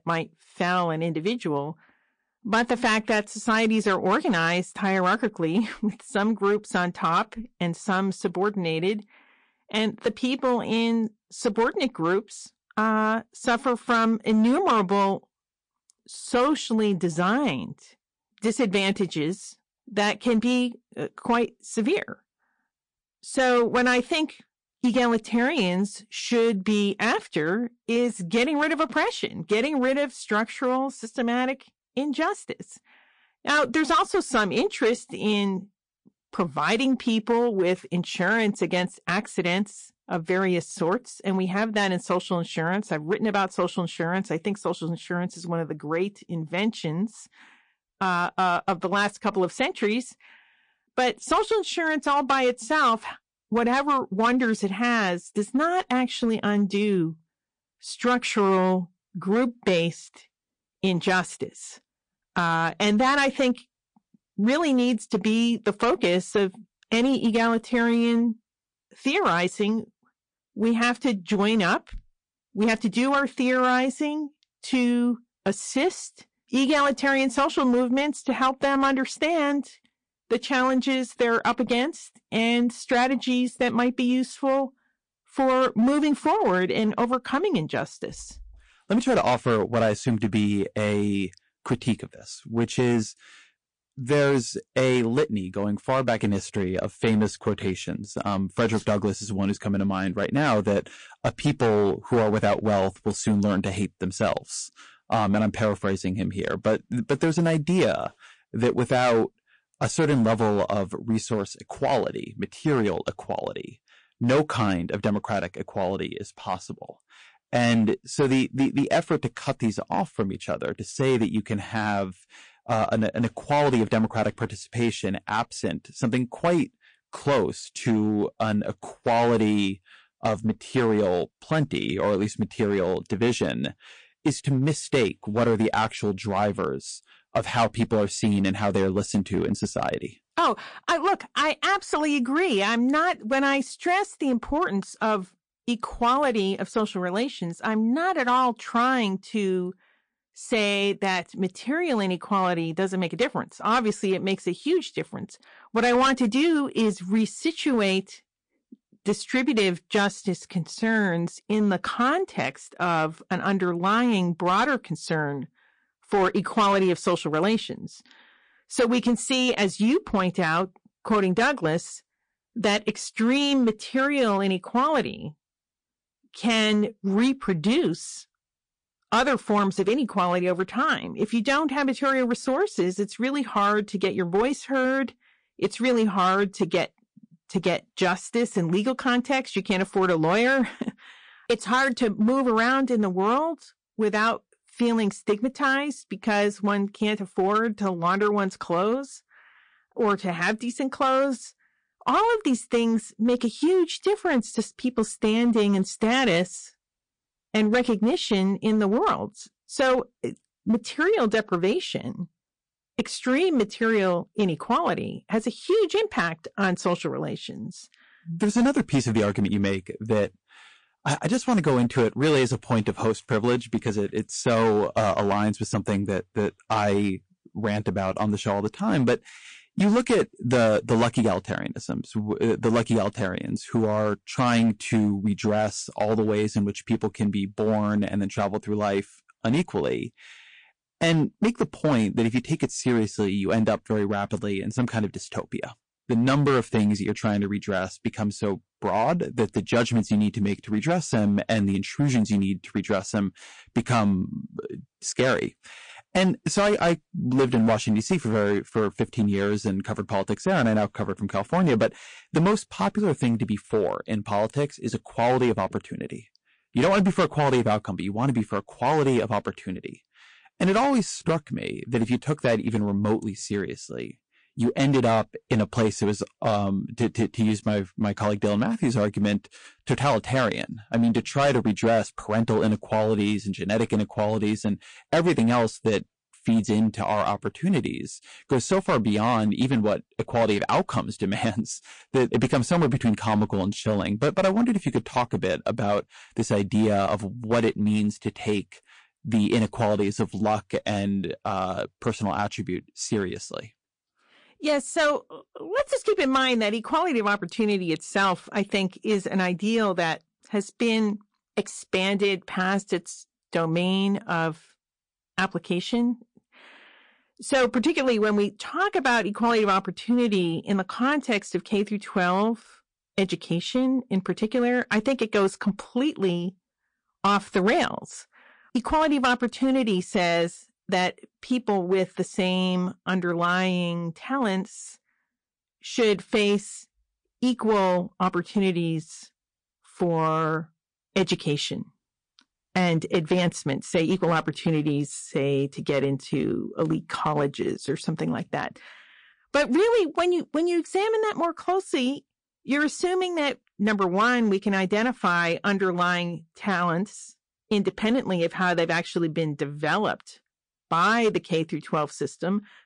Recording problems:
distortion; slight; 5% of the sound clipped
garbled, watery; slightly; nothing above 9 kHz

